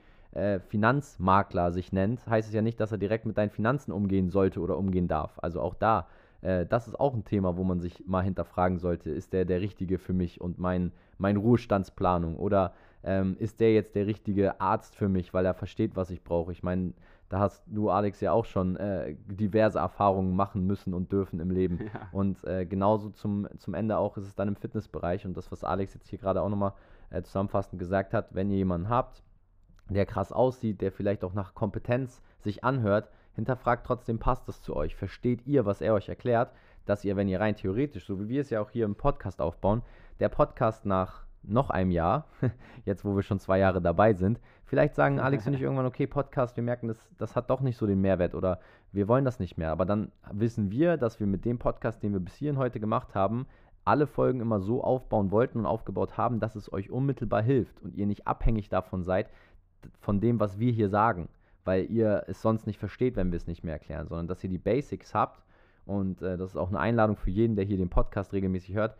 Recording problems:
muffled; very; fading above 2.5 kHz

